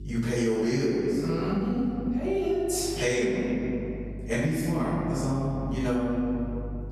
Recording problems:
room echo; strong; dies away in 1.8 s
off-mic speech; far
squashed, flat; somewhat
electrical hum; faint; throughout; 50 Hz, 25 dB below the speech

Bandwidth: 13.5 kHz